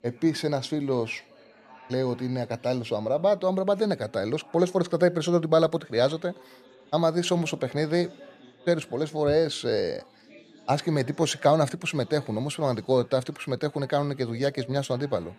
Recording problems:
chatter from many people; faint; throughout; 25 dB below the speech

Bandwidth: 14 kHz